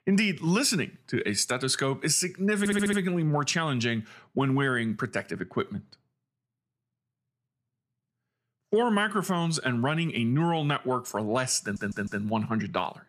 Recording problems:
audio stuttering; at 2.5 s and at 12 s

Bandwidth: 14.5 kHz